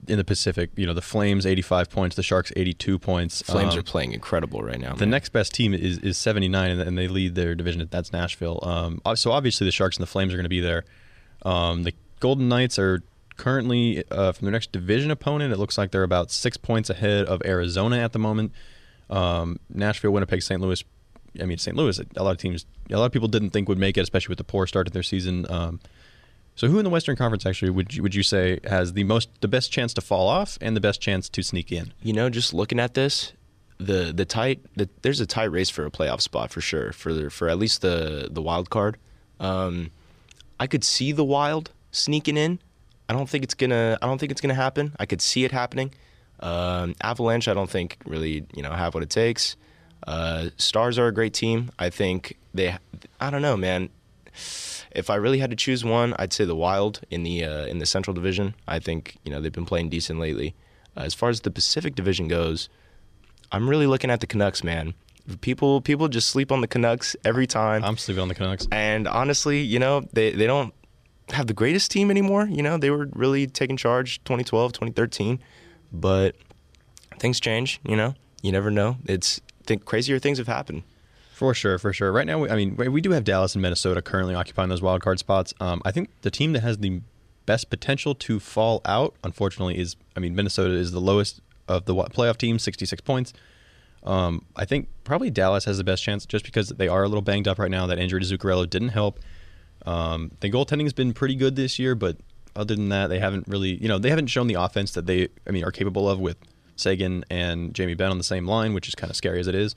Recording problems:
none

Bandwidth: 14 kHz